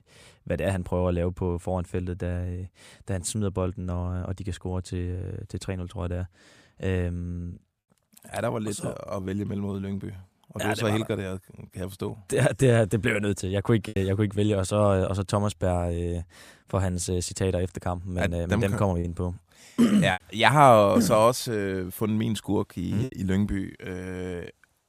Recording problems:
choppy; occasionally; at 14 s and from 19 to 23 s; 4% of the speech affected

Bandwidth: 15 kHz